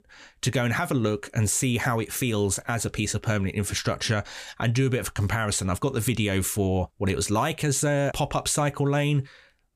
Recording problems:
none

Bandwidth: 15 kHz